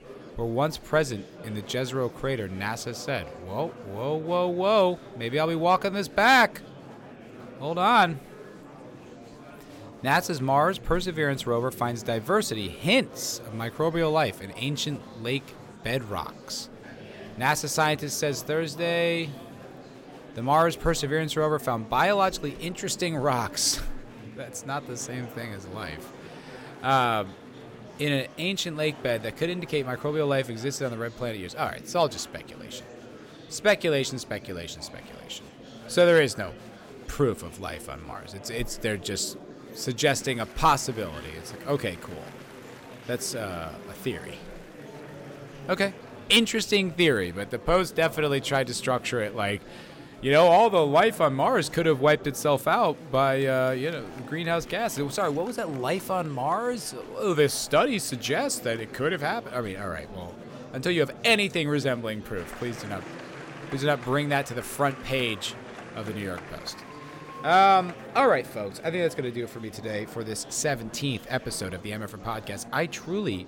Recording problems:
murmuring crowd; noticeable; throughout; 20 dB below the speech

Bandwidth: 16.5 kHz